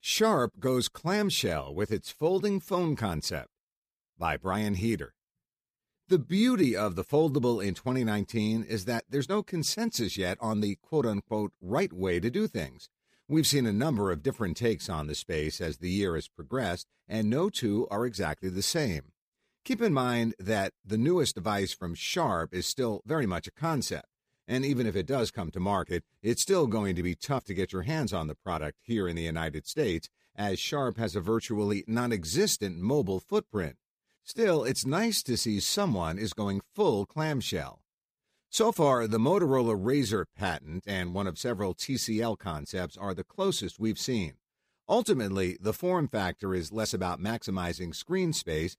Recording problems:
none

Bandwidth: 15 kHz